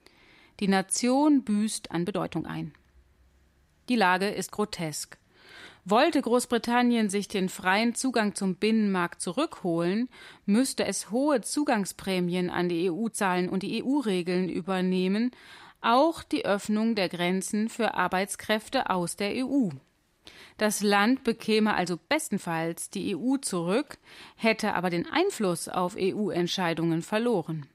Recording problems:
uneven, jittery; strongly; from 1 to 25 s

